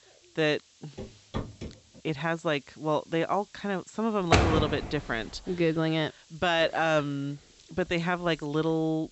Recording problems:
high frequencies cut off; noticeable; nothing above 8 kHz
hiss; faint; throughout; 30 dB below the speech
footsteps; noticeable; at 1 s; peak 8 dB below the speech
door banging; loud; at 4.5 s; peak 6 dB above the speech

